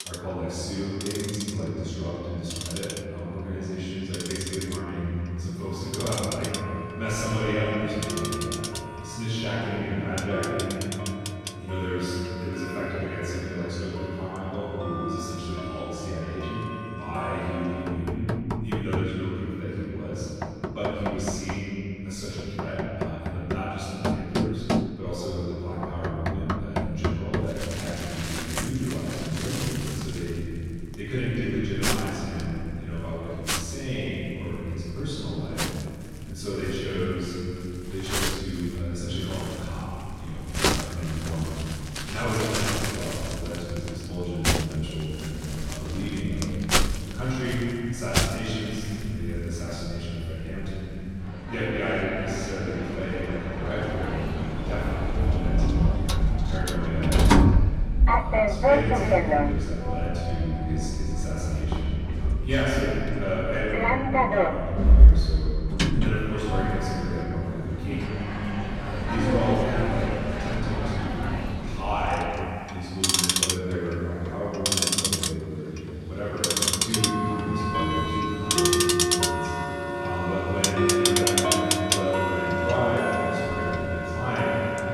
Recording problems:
room echo; strong; dies away in 3 s
off-mic speech; far
household noises; very loud; throughout; 3 dB above the speech

